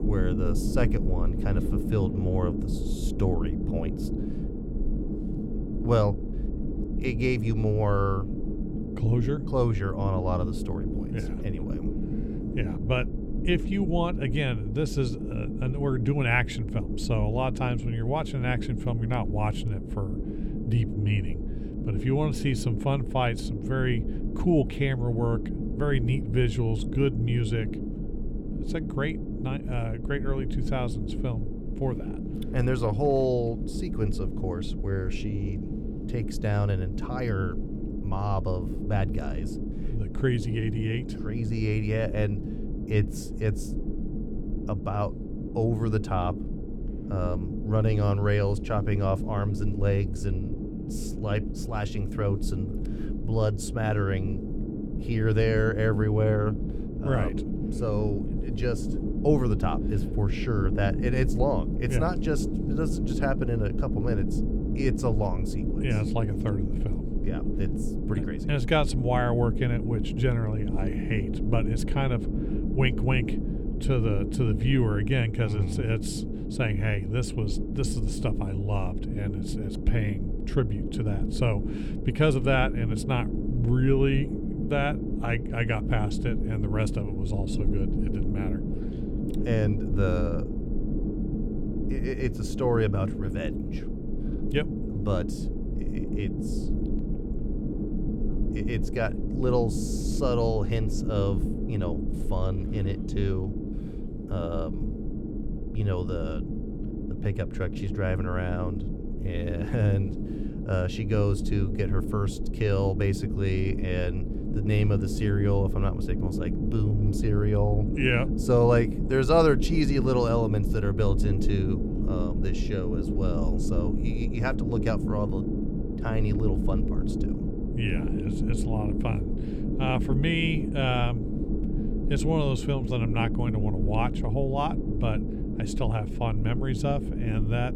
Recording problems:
low rumble; loud; throughout; 7 dB below the speech

